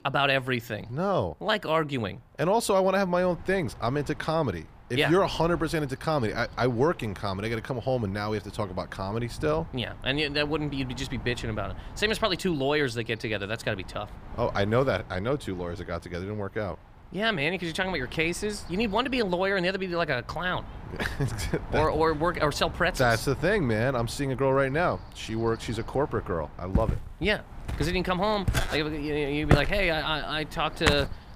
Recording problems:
wind noise on the microphone; occasional gusts; 20 dB below the speech
footsteps; loud; from 27 s on; peak 2 dB above the speech

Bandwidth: 15 kHz